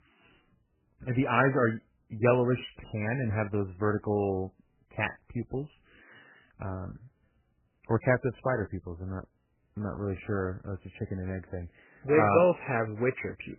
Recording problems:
garbled, watery; badly; nothing above 3 kHz

